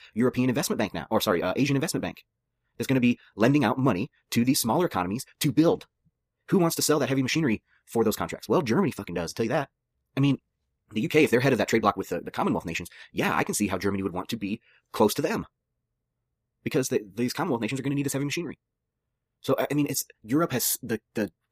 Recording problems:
wrong speed, natural pitch; too fast; 1.7 times normal speed

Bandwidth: 15 kHz